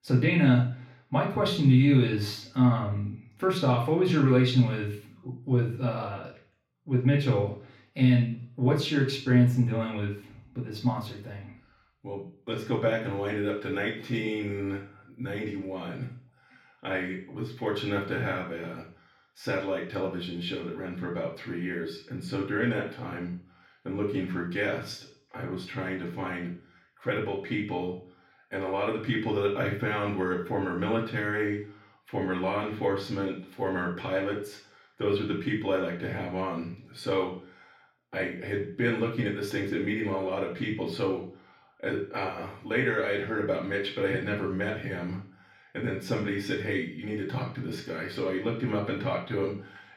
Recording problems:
off-mic speech; far
room echo; noticeable; dies away in 0.5 s

